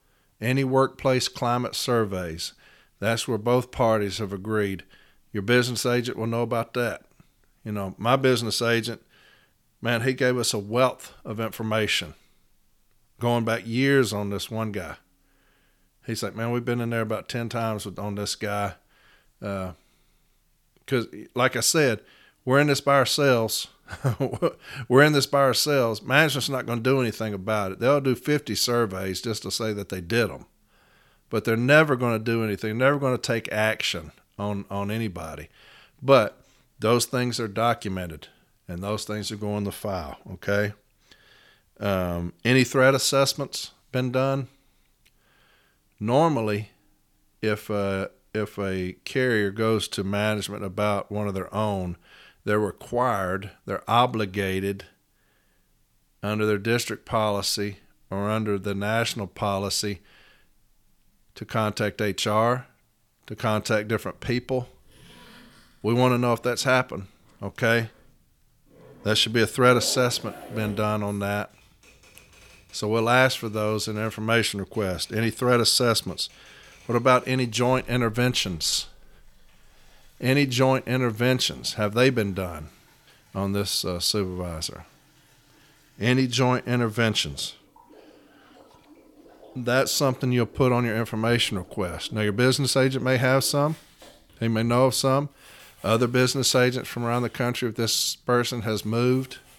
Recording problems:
household noises; faint; from 1:04 on; 25 dB below the speech

